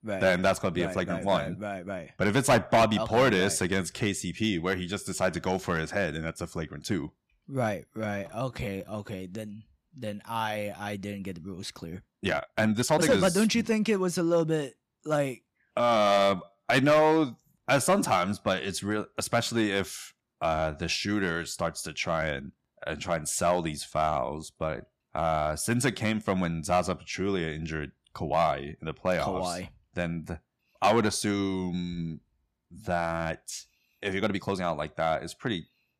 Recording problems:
distortion; slight; 2% of the sound clipped
uneven, jittery; strongly; from 1 to 35 s

